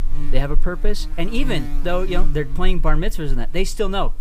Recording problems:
electrical hum; noticeable; throughout; 50 Hz, 15 dB below the speech

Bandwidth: 15 kHz